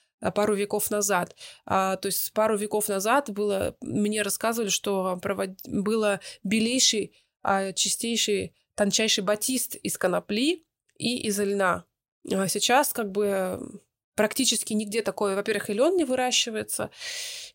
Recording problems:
none

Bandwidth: 16 kHz